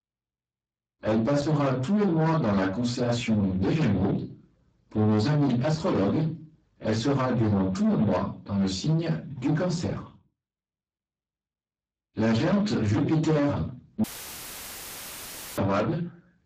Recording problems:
distortion; heavy; 8 dB below the speech
off-mic speech; far
garbled, watery; badly; nothing above 7.5 kHz
room echo; very slight; dies away in 0.3 s
audio cutting out; filled with static; at 14 s for 1.5 s

